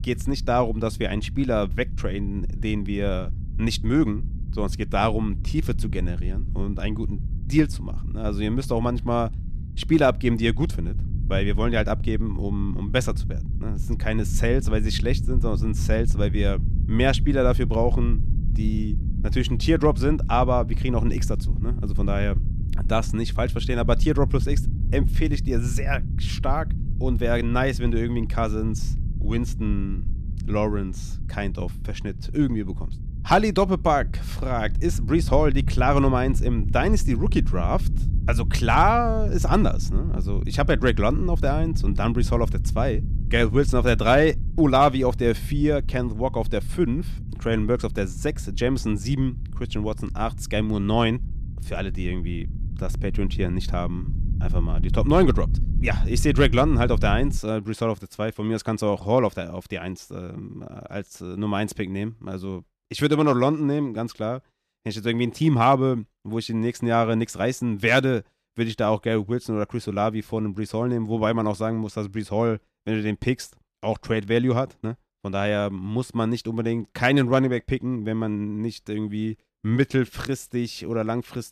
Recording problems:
low rumble; noticeable; until 57 s; 20 dB below the speech

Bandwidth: 14.5 kHz